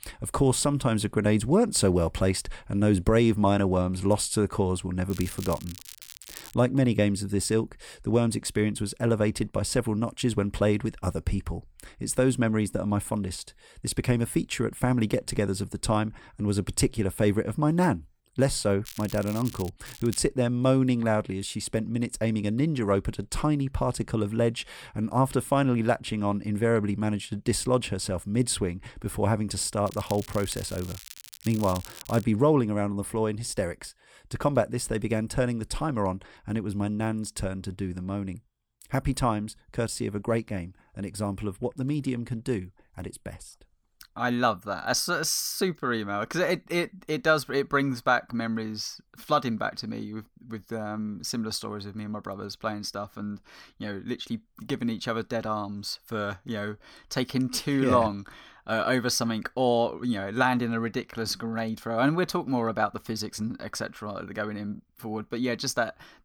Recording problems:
crackling; noticeable; 4 times, first at 5 s; 15 dB below the speech

